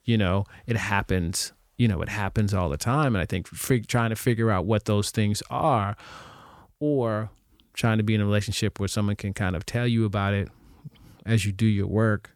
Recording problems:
none

